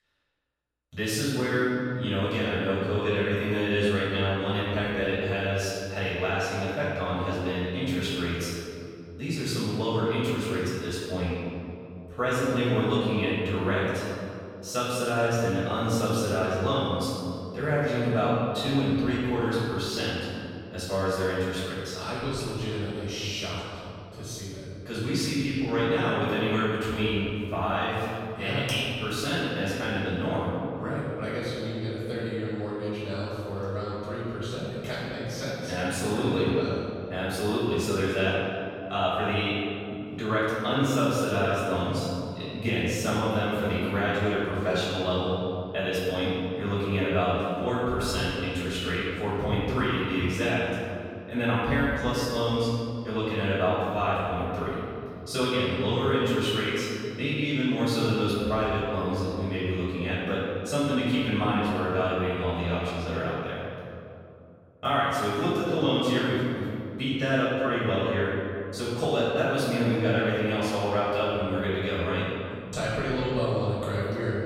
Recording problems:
room echo; strong; dies away in 2.4 s
off-mic speech; far

